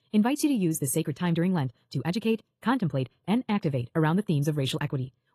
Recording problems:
wrong speed, natural pitch; too fast; 1.5 times normal speed
garbled, watery; slightly; nothing above 13.5 kHz

